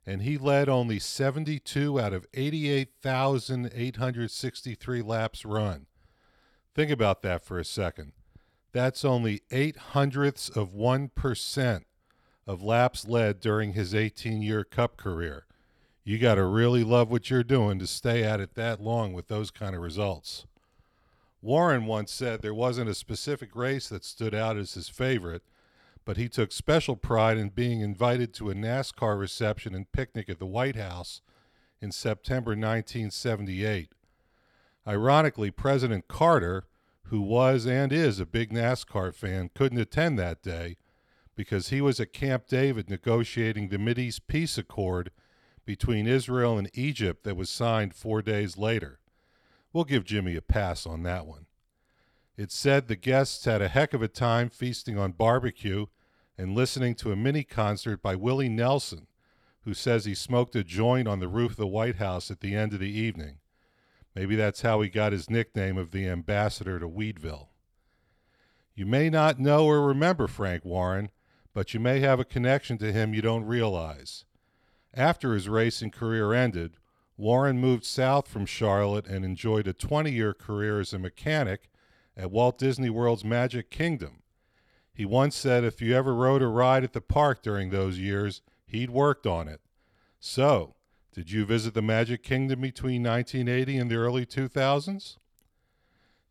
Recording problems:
none

